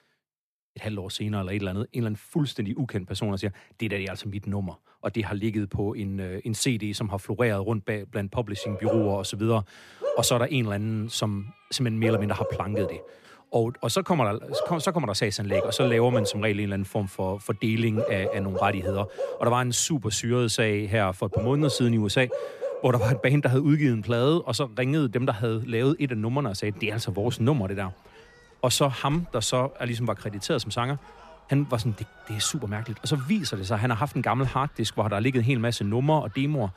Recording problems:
animal sounds; loud; from 8.5 s on; 7 dB below the speech

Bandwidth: 14.5 kHz